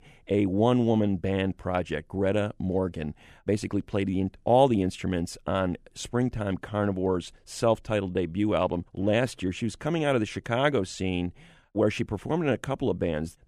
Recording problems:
none

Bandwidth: 14.5 kHz